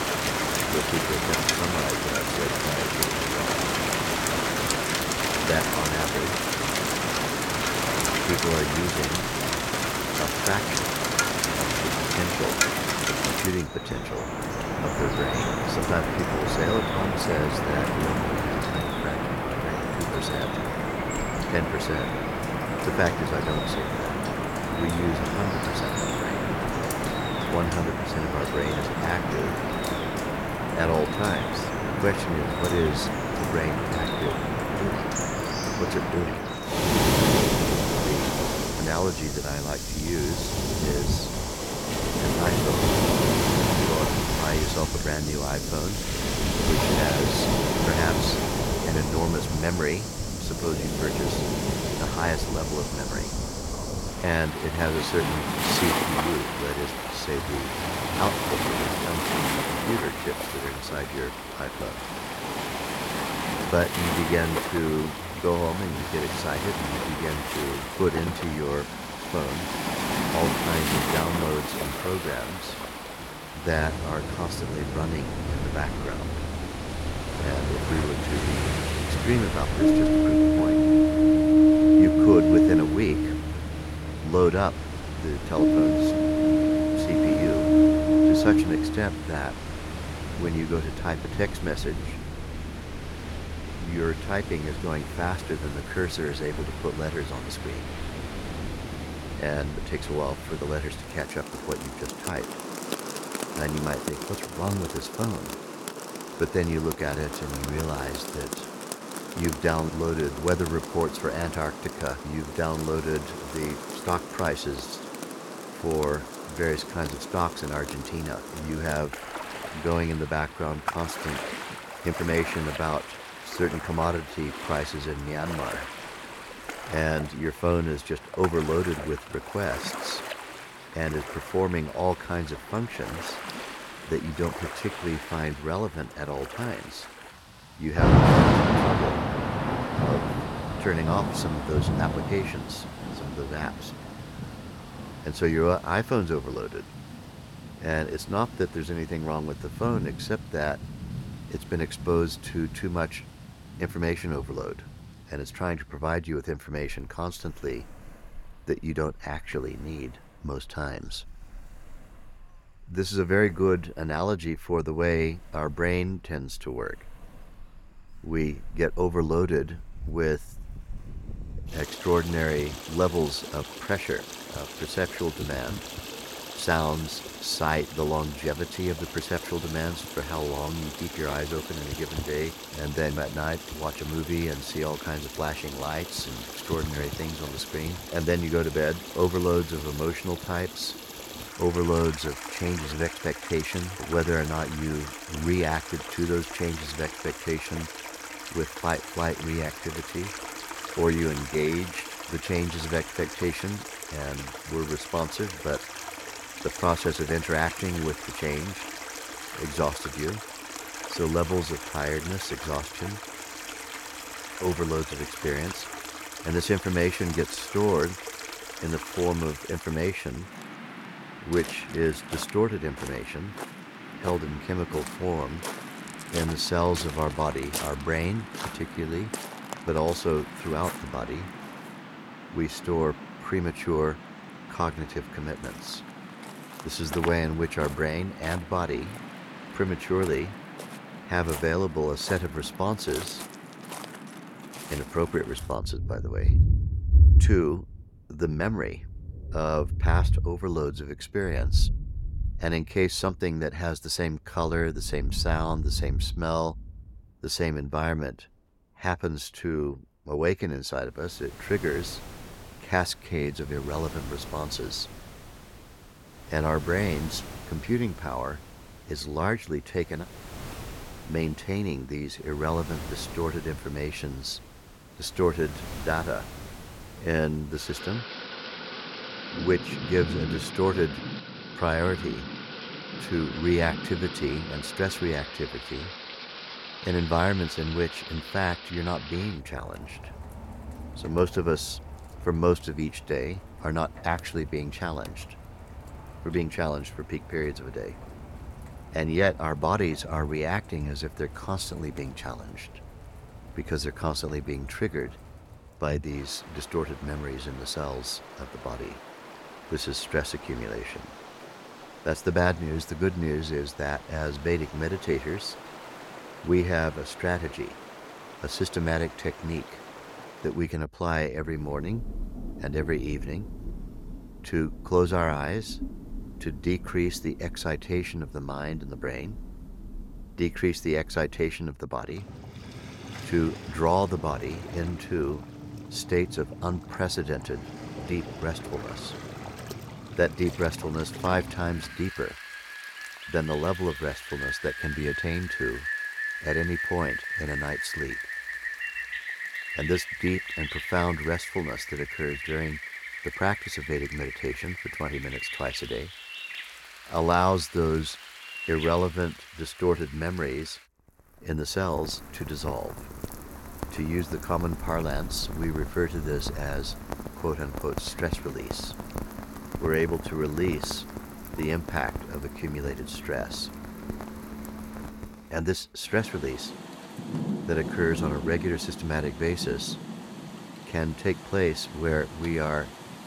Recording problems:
rain or running water; very loud; throughout; as loud as the speech

